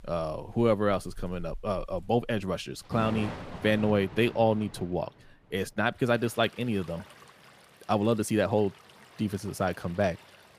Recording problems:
rain or running water; noticeable; throughout; 15 dB below the speech

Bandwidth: 15 kHz